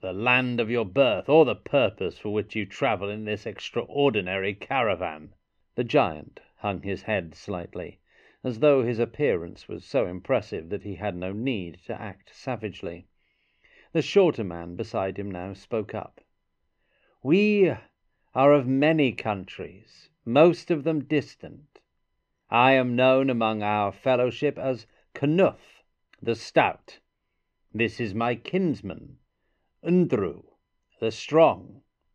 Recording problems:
muffled; slightly; fading above 3 kHz

